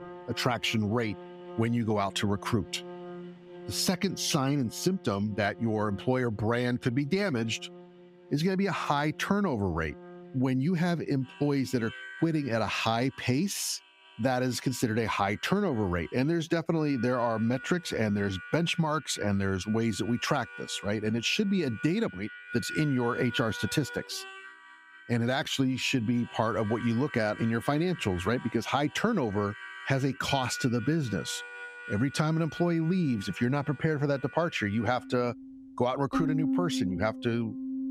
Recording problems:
squashed, flat; somewhat, background pumping
background music; noticeable; throughout; 15 dB below the speech

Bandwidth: 15.5 kHz